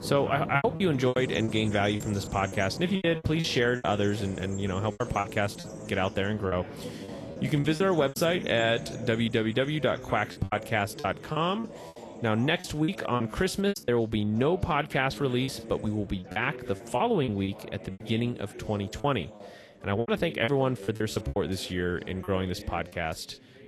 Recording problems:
garbled, watery; slightly; nothing above 12.5 kHz
animal sounds; noticeable; throughout; 15 dB below the speech
background chatter; noticeable; throughout; 3 voices, 15 dB below the speech
choppy; very; 10% of the speech affected

